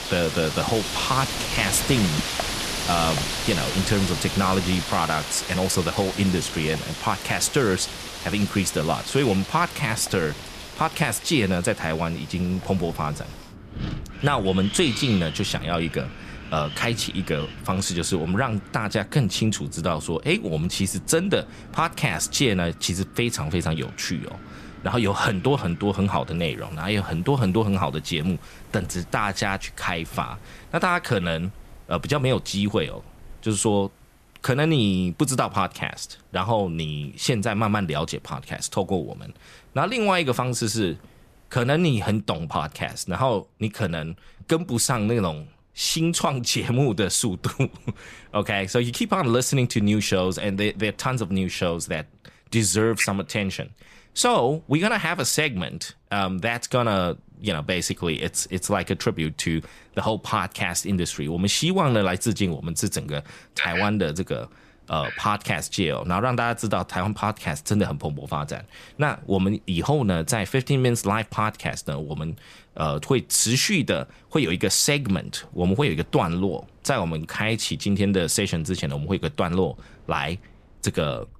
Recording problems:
wind in the background; loud; throughout; 9 dB below the speech

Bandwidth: 14.5 kHz